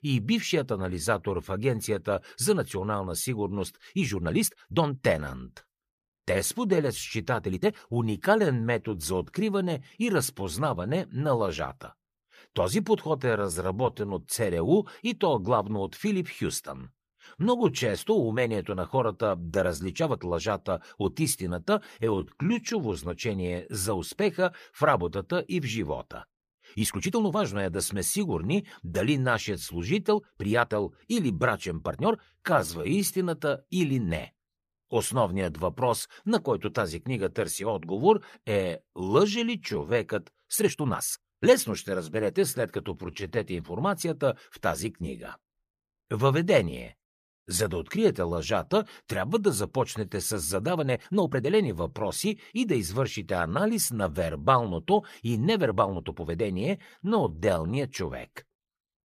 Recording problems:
uneven, jittery; strongly; from 4 to 58 s

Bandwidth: 14.5 kHz